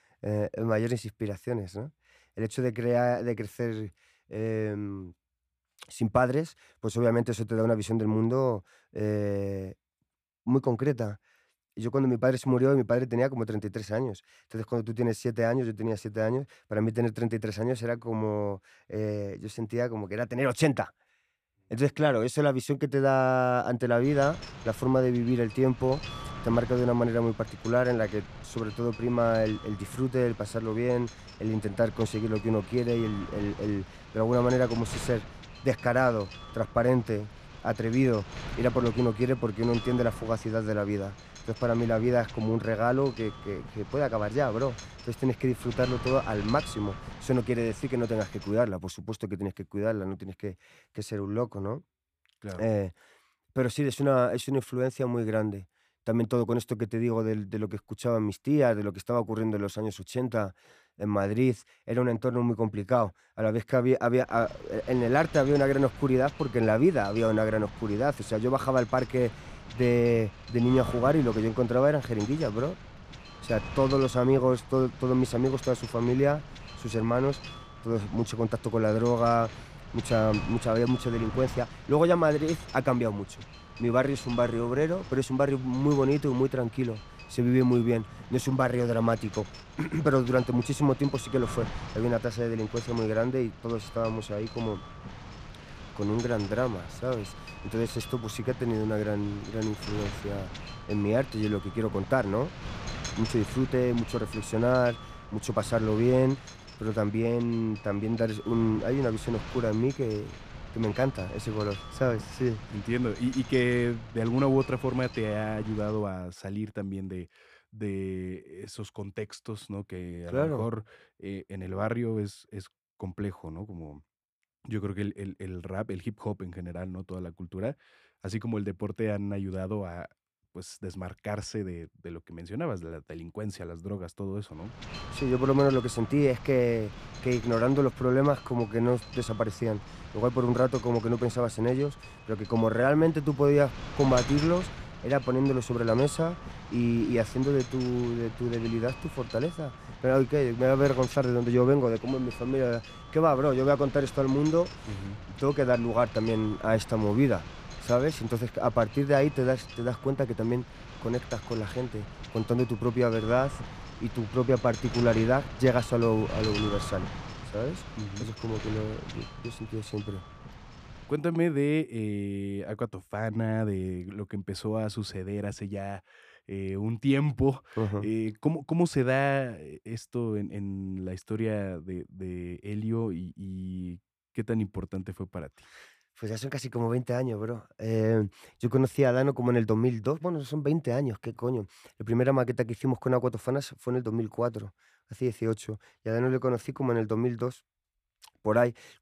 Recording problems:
wind noise on the microphone; occasional gusts; from 24 to 49 s, from 1:04 to 1:56 and from 2:15 to 2:51; 15 dB below the speech

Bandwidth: 14.5 kHz